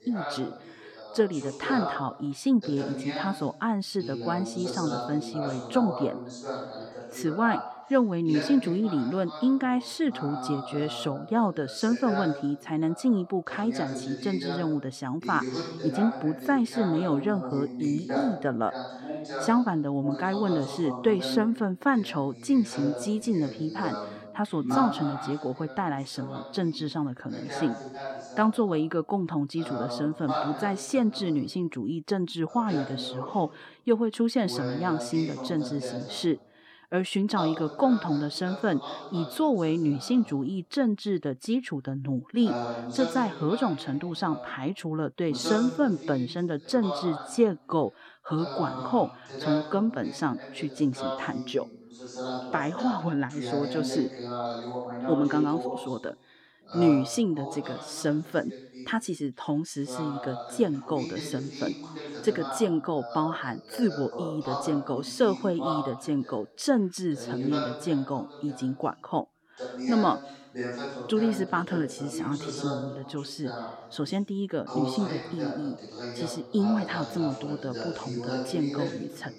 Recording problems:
voice in the background; loud; throughout; 8 dB below the speech

